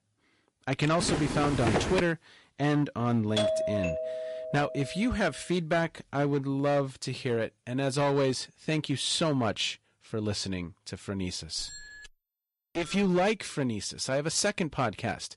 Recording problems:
distortion; slight; 10% of the sound clipped
garbled, watery; slightly; nothing above 11 kHz
footsteps; loud; from 1 to 2 s; peak 1 dB above the speech
doorbell; loud; from 3.5 to 5 s; peak 2 dB above the speech
doorbell; noticeable; from 12 to 13 s; peak 7 dB below the speech

